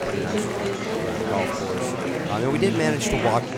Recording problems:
murmuring crowd; very loud; throughout; as loud as the speech

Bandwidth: 18 kHz